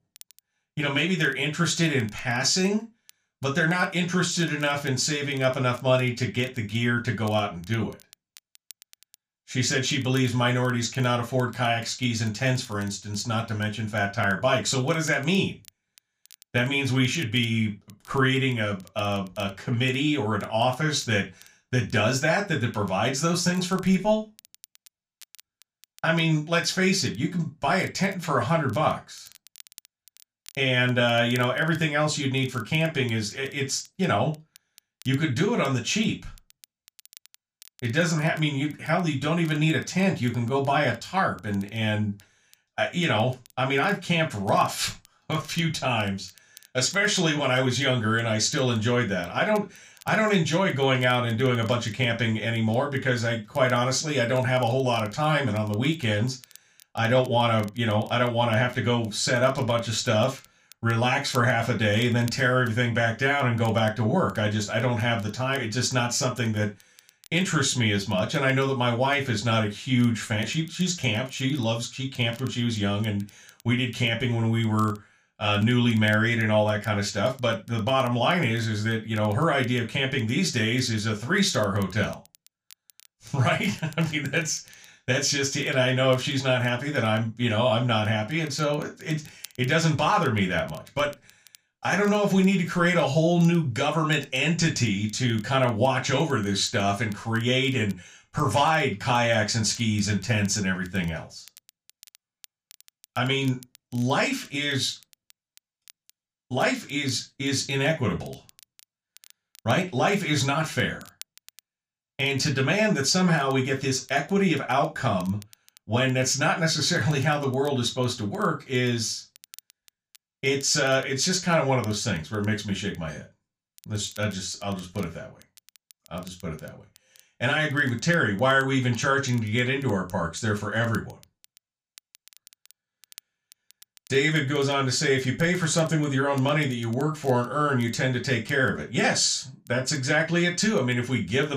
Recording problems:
room echo; very slight; dies away in 0.2 s
off-mic speech; somewhat distant
crackle, like an old record; faint; 30 dB below the speech
abrupt cut into speech; at the end

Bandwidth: 15 kHz